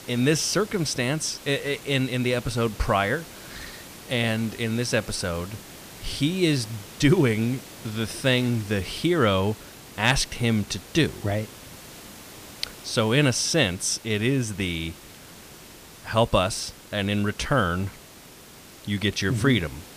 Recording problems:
hiss; noticeable; throughout; 20 dB below the speech

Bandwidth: 15 kHz